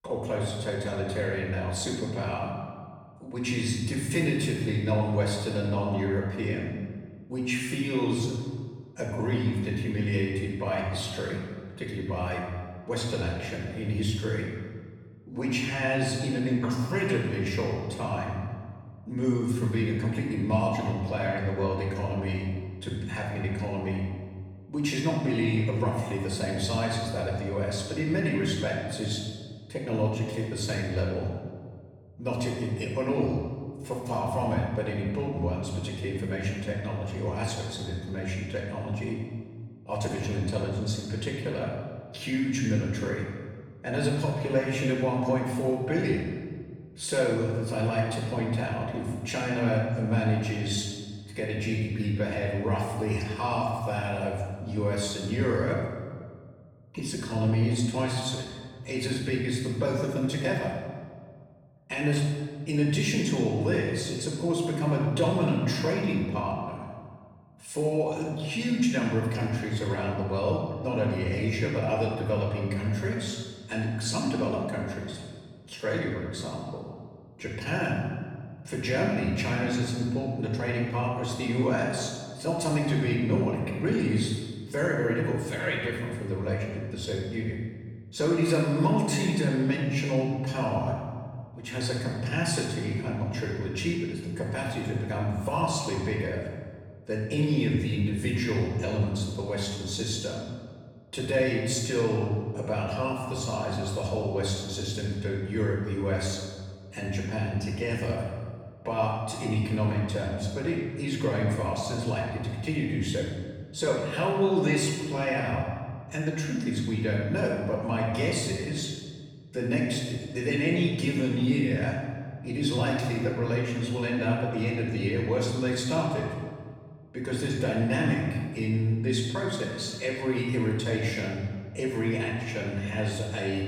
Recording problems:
off-mic speech; far
room echo; noticeable; dies away in 1.5 s

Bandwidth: 18.5 kHz